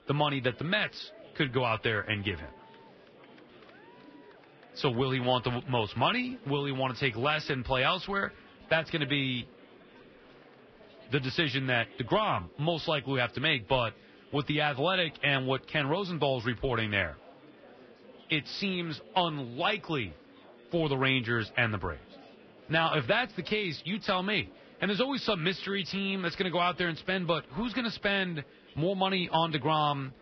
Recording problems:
garbled, watery; badly; nothing above 5.5 kHz
murmuring crowd; faint; throughout; 25 dB below the speech

